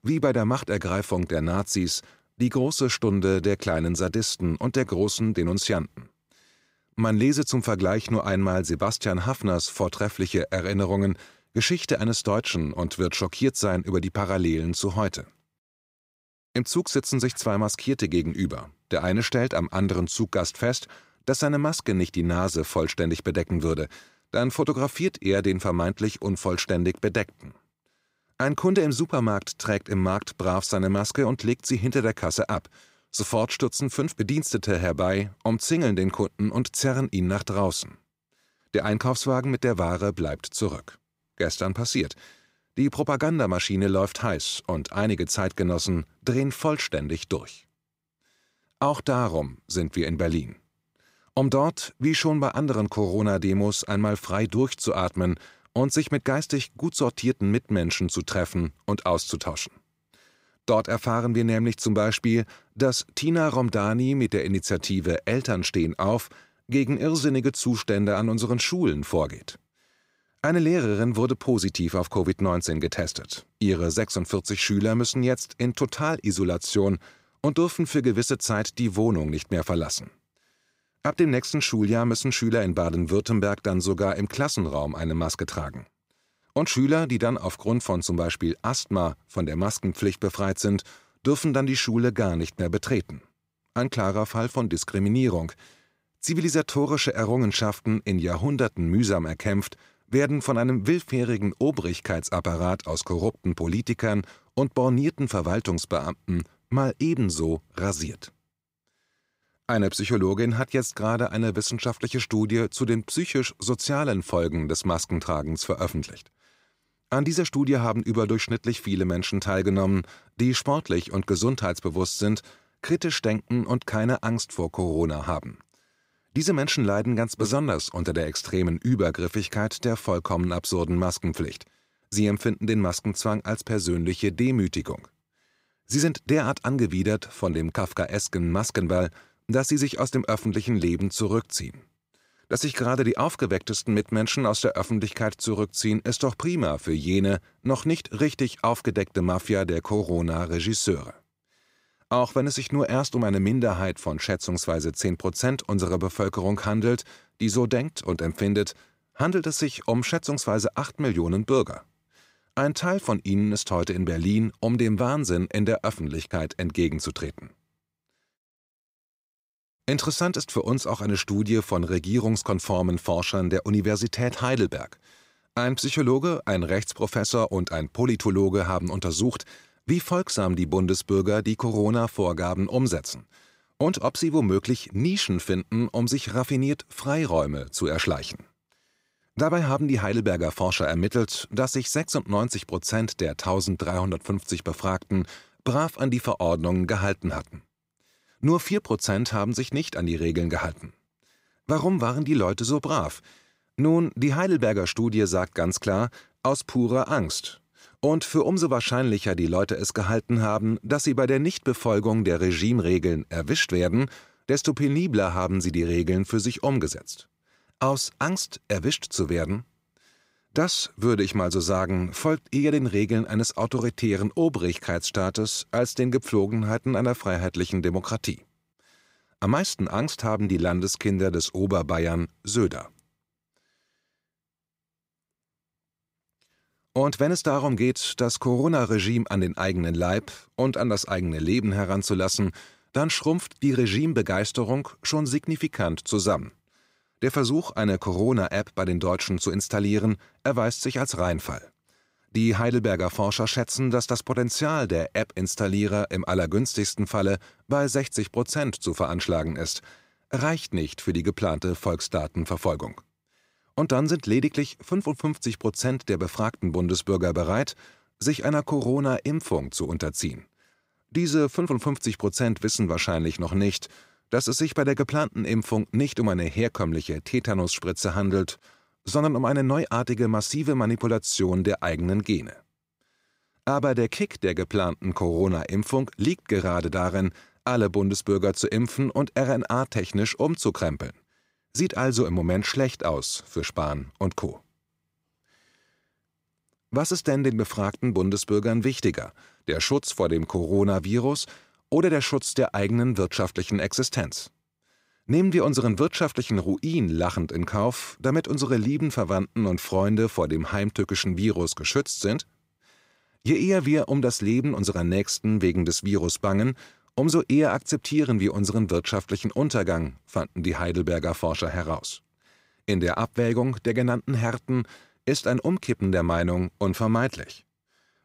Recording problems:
none

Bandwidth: 15.5 kHz